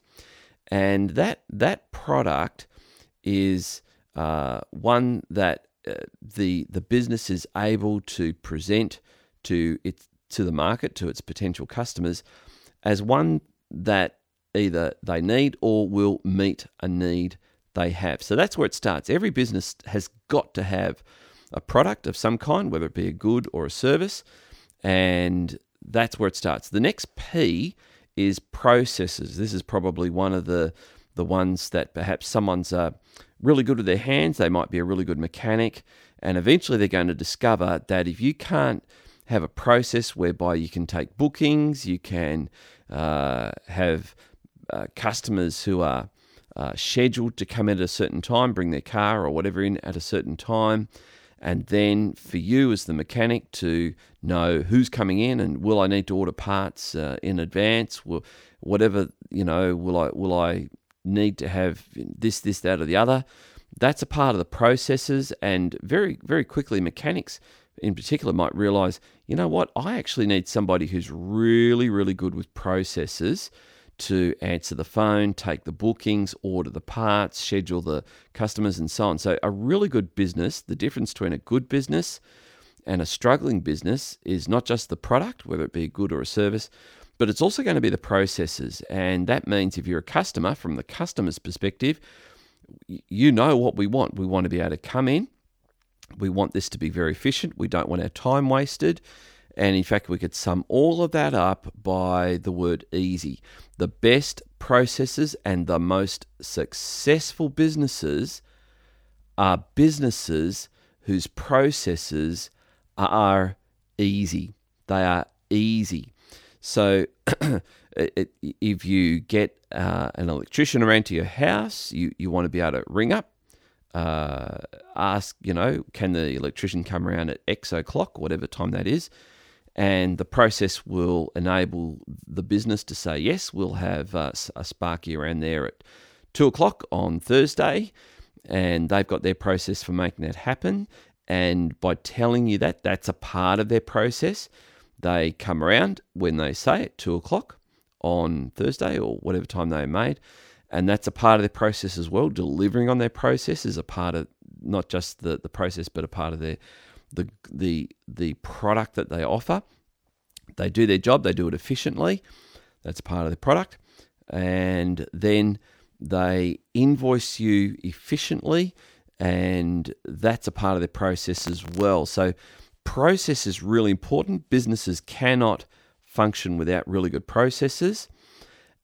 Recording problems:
none

